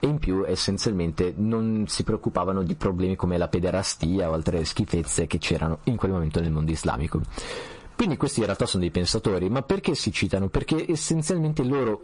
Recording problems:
distortion; slight; 10 dB below the speech
garbled, watery; slightly; nothing above 10.5 kHz
squashed, flat; somewhat

